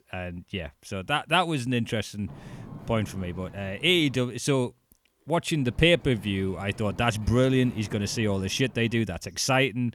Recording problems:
wind noise on the microphone; occasional gusts; from 2.5 to 4 s and from 5.5 to 9 s; 25 dB below the speech

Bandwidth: 18.5 kHz